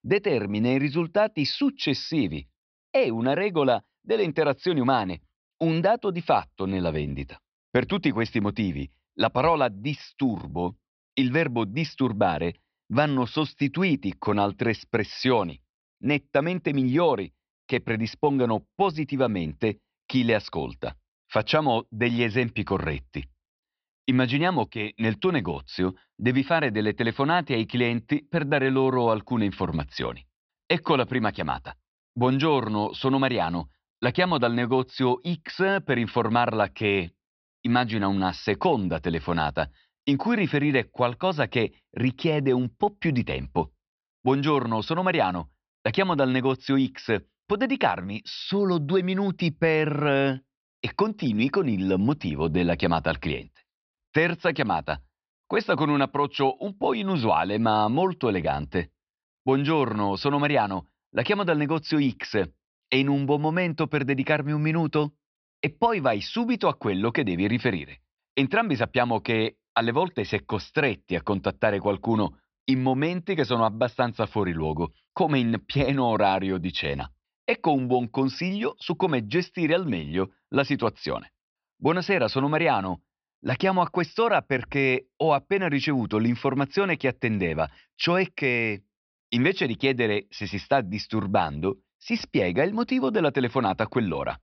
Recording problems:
high frequencies cut off; noticeable; nothing above 5.5 kHz

